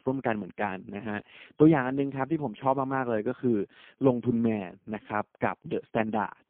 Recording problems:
phone-call audio; poor line

